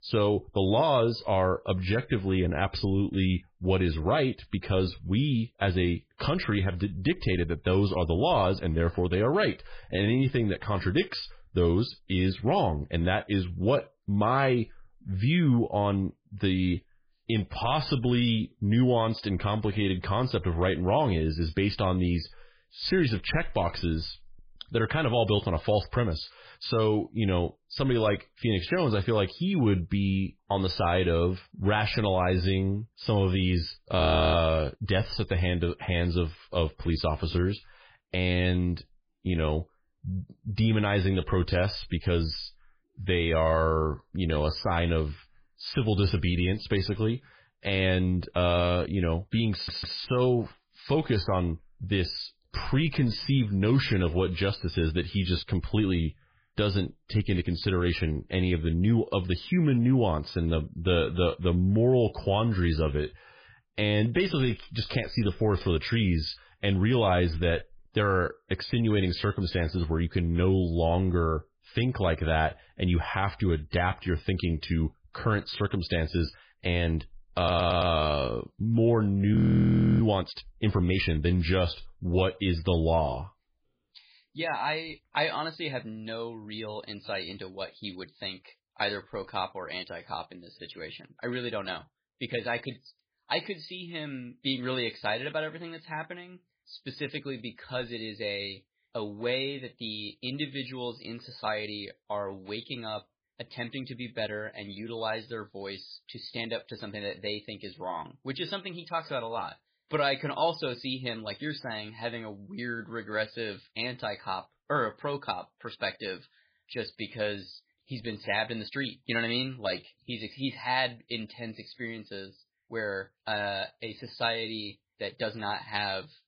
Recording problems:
garbled, watery; badly; nothing above 5 kHz
audio freezing; at 34 s and at 1:19 for 0.5 s
audio stuttering; at 50 s and at 1:17

